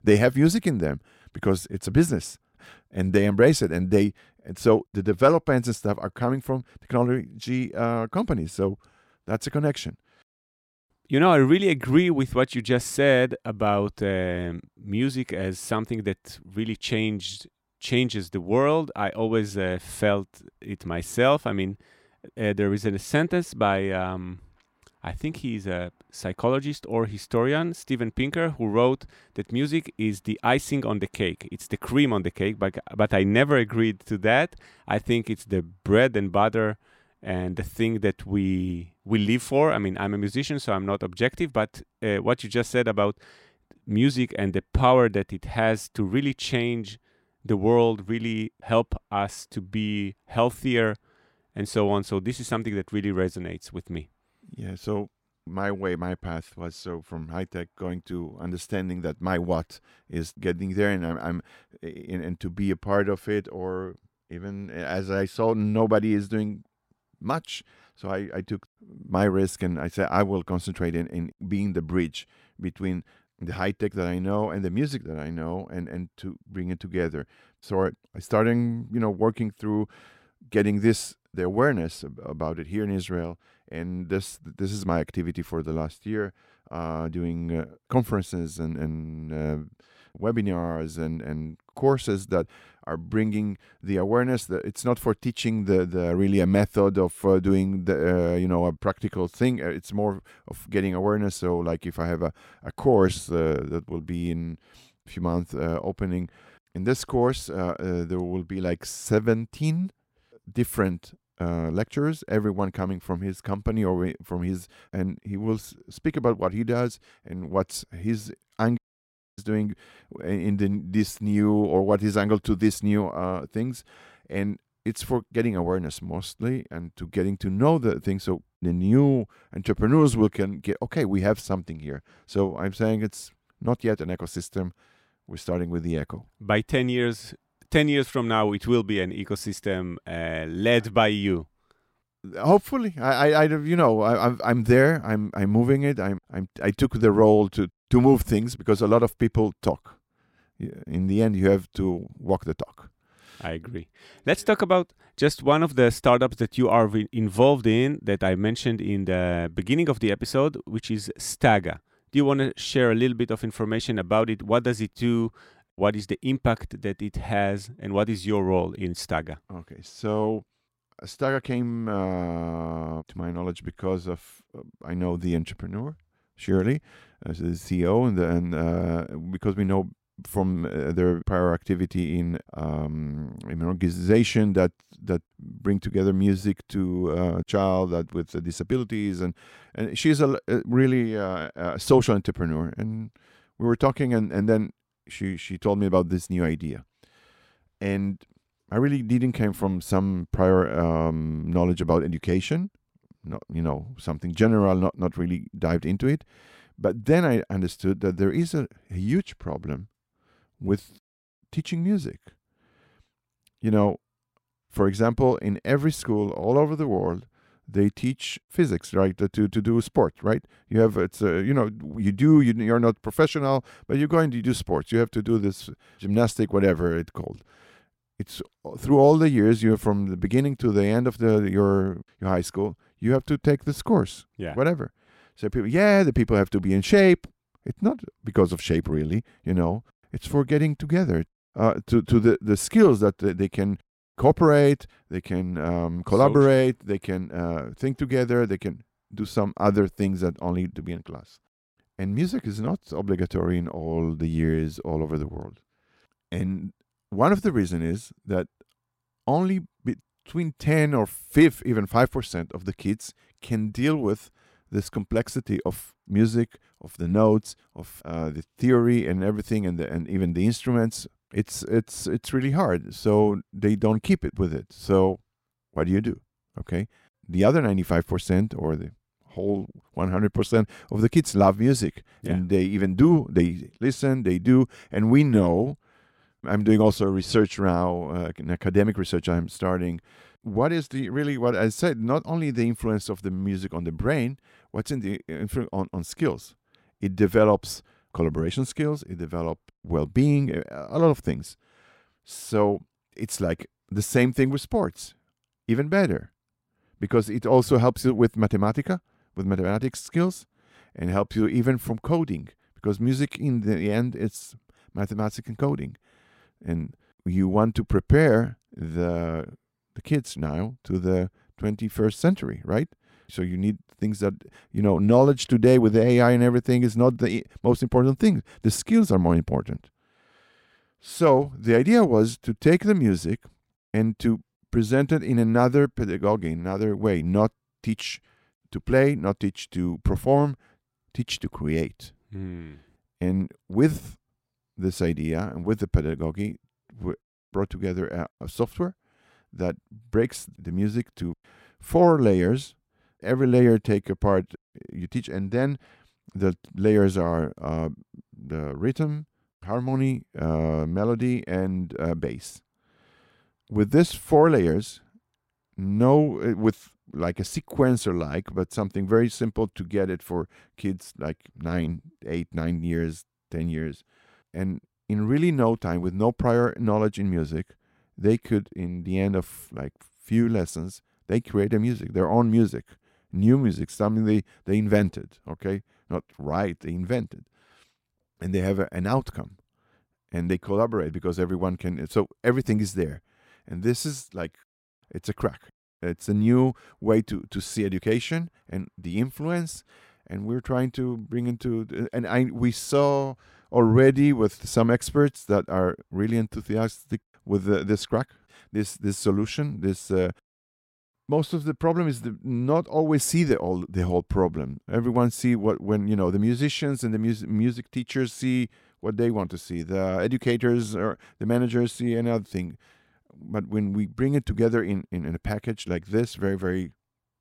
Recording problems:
audio cutting out; at 1:59 for 0.5 s

